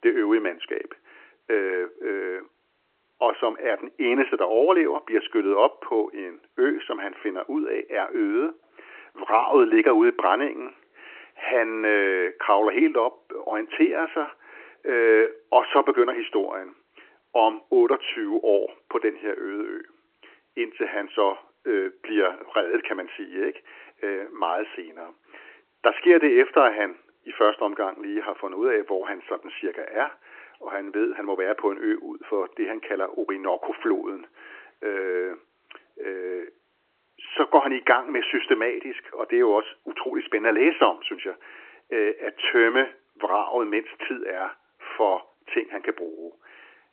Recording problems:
phone-call audio; nothing above 3 kHz

